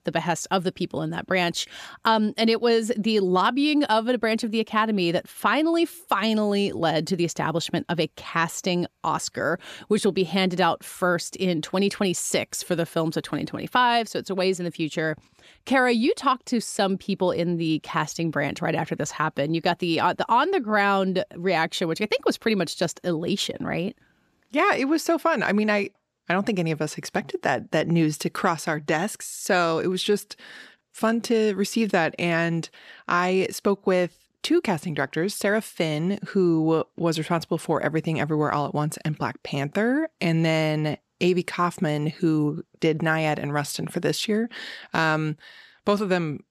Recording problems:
none

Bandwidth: 14.5 kHz